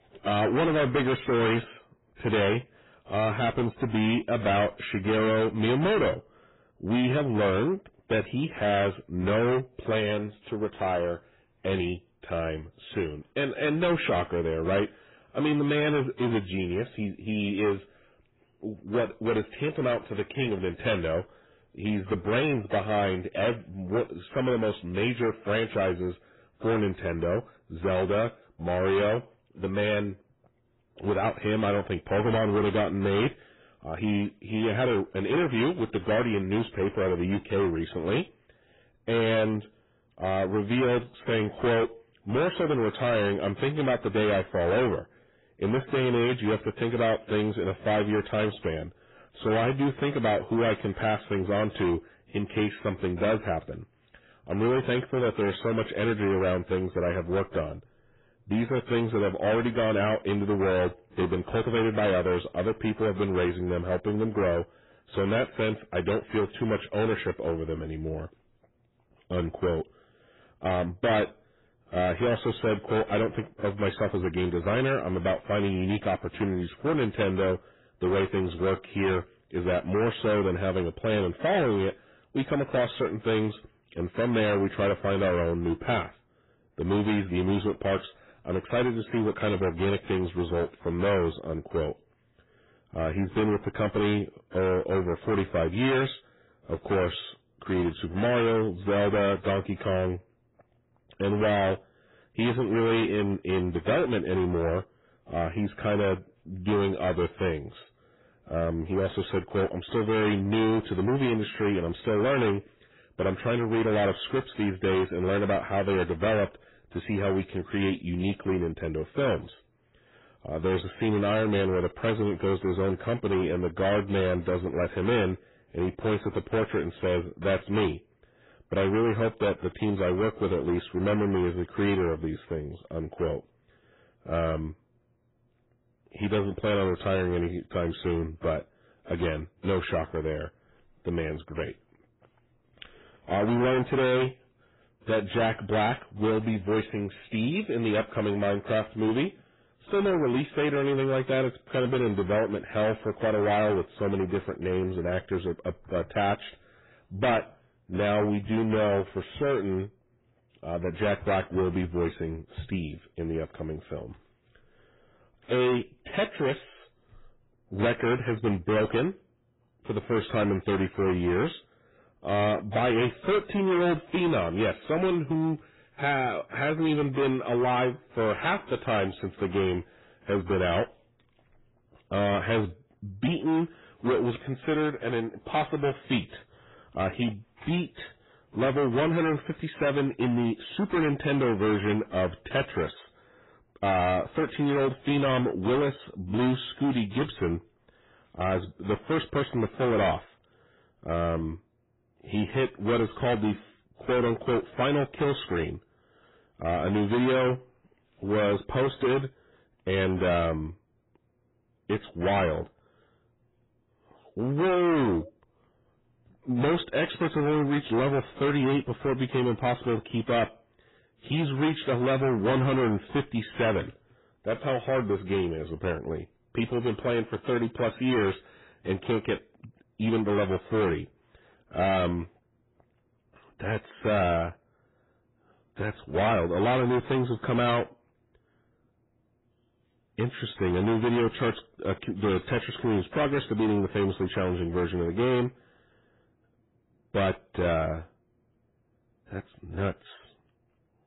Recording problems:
distortion; heavy; 14% of the sound clipped
garbled, watery; badly; nothing above 4 kHz

